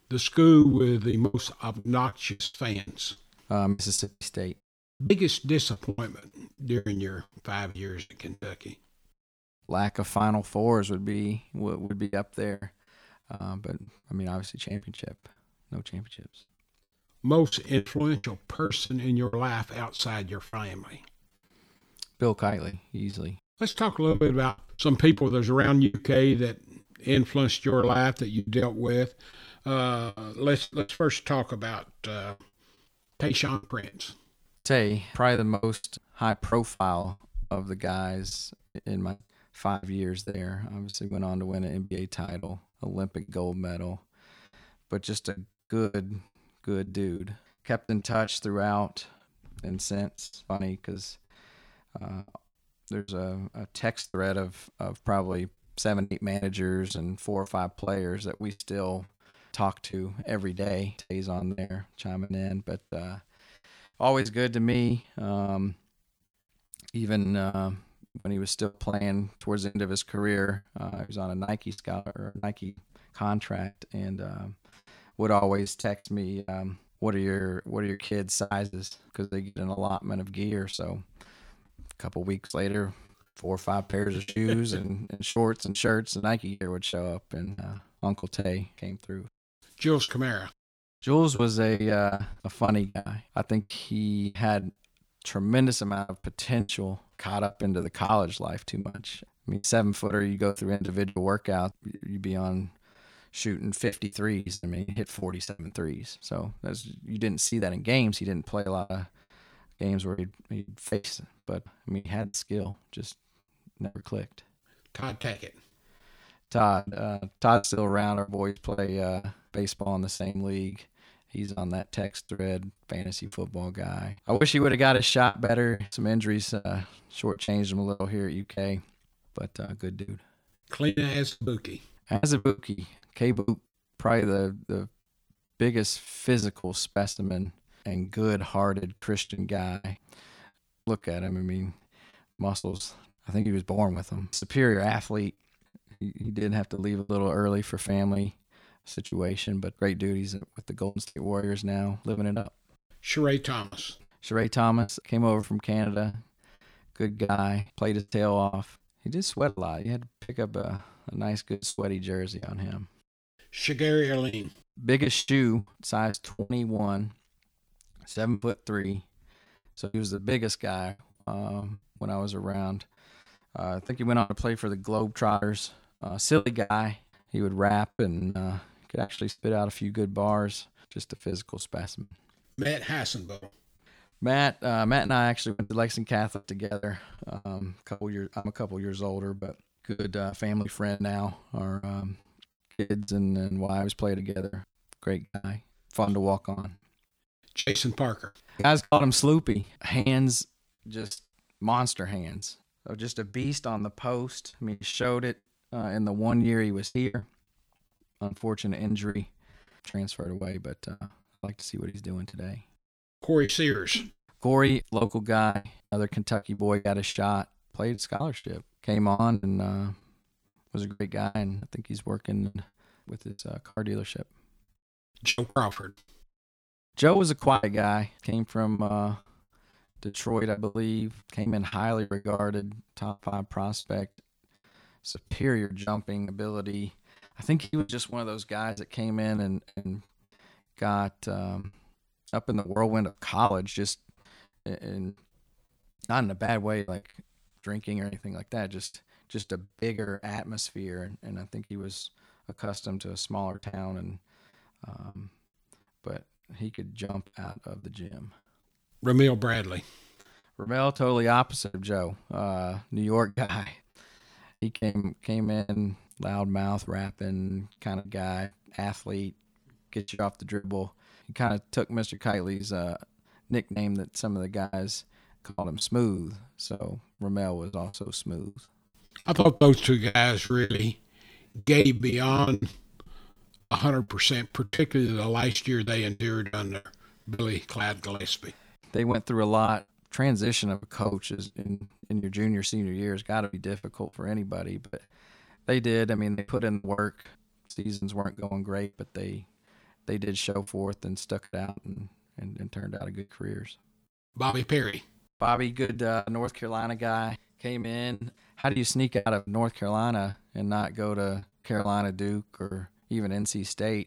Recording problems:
choppy; very; 14% of the speech affected

